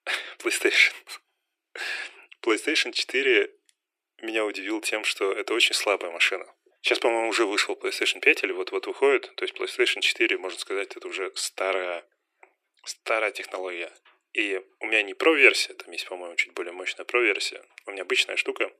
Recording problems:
thin; very; fading below 300 Hz

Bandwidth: 14.5 kHz